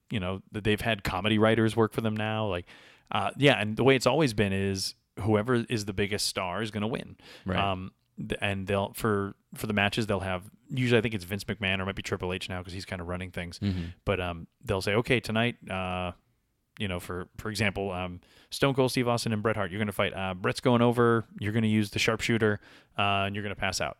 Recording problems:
none

